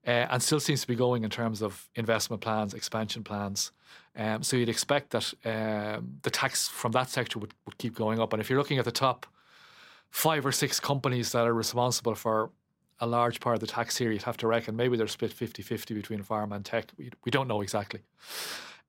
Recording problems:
none

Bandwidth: 16 kHz